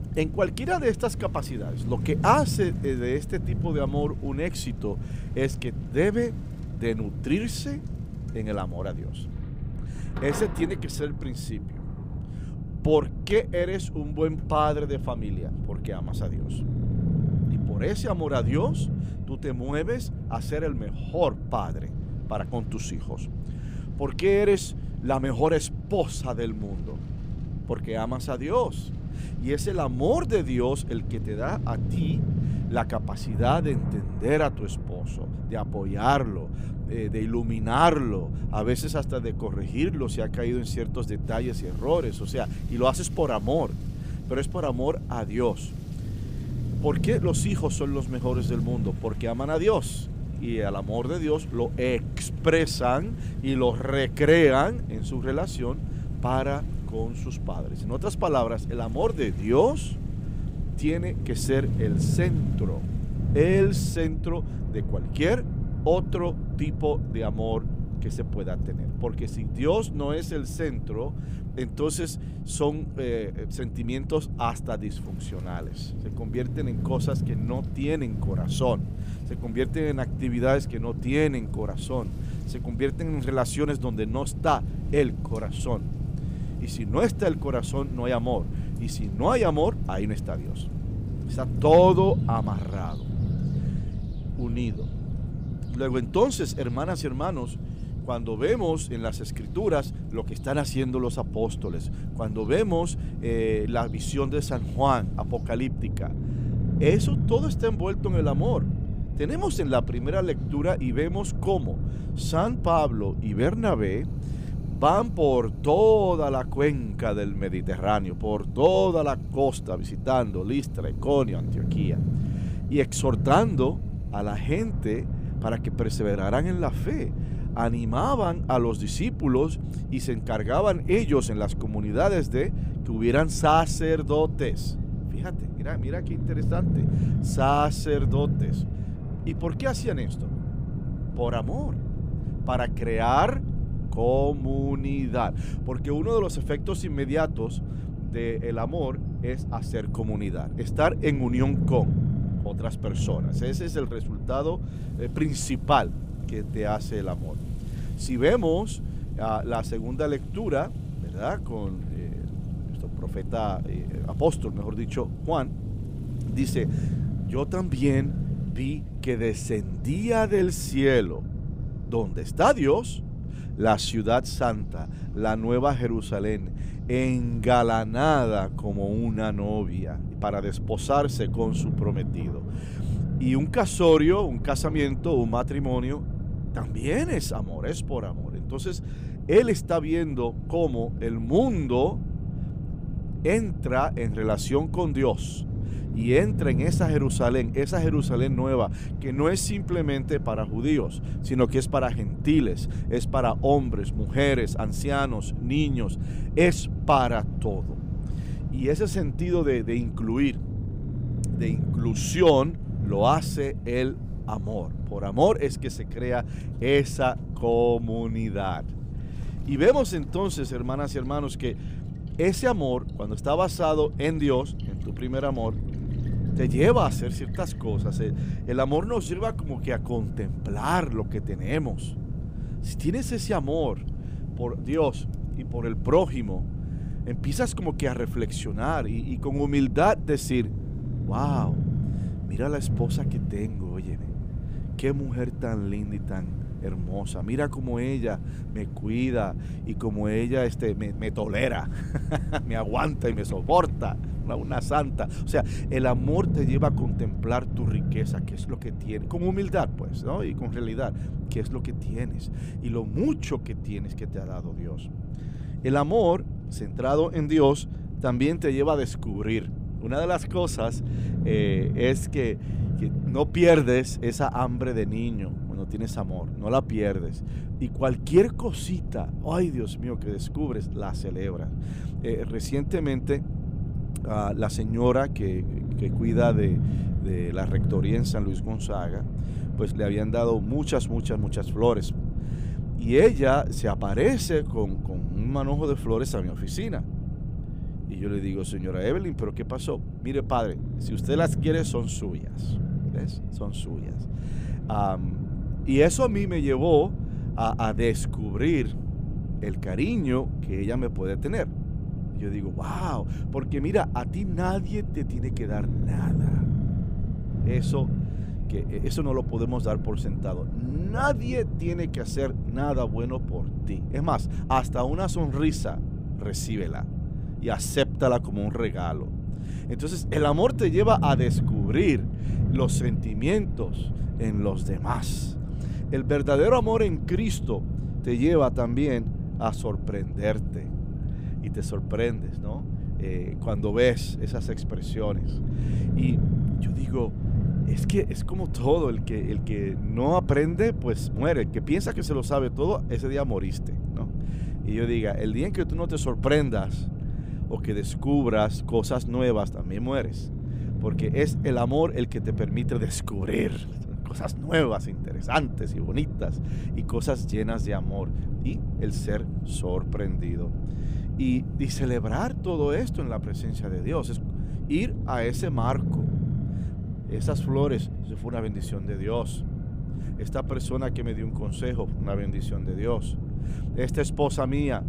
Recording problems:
low rumble; noticeable; throughout; 15 dB below the speech
rain or running water; faint; until 4:16; 30 dB below the speech

